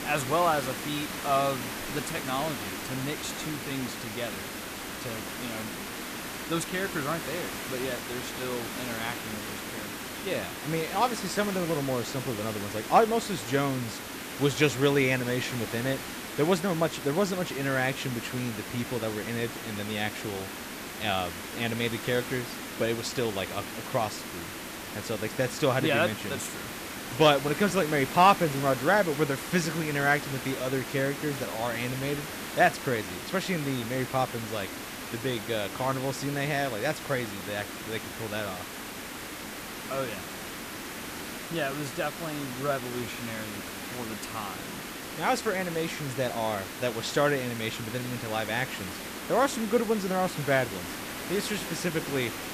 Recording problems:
hiss; loud; throughout; 7 dB below the speech

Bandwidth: 14.5 kHz